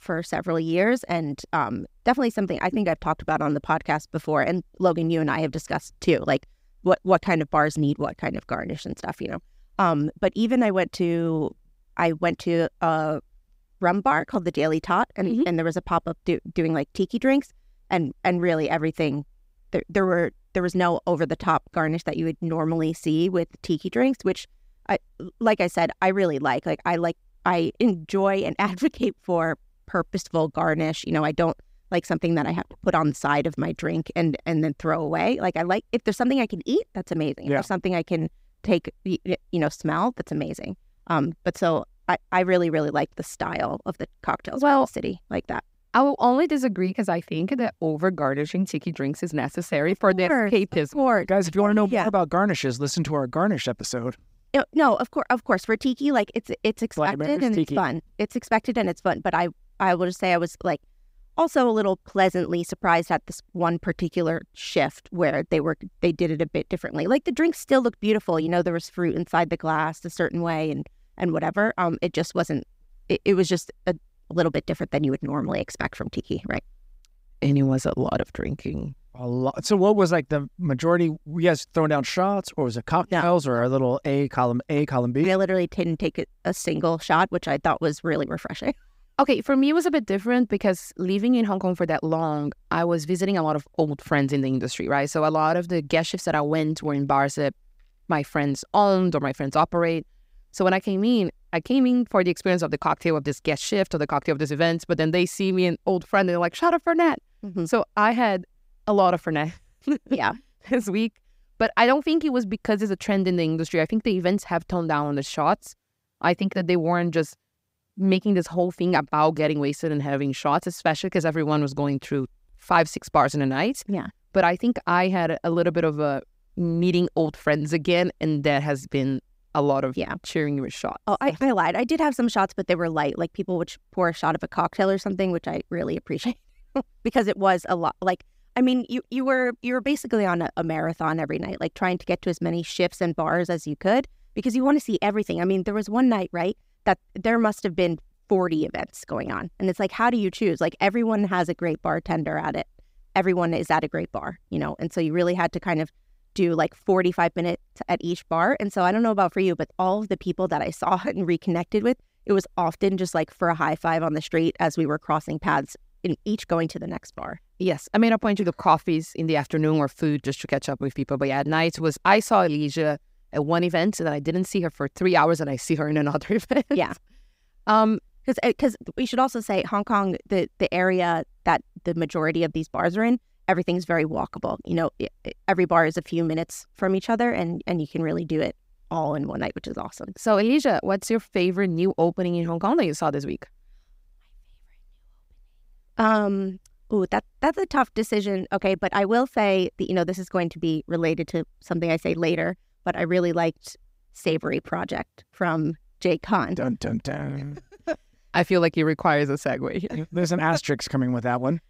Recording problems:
none

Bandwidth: 15.5 kHz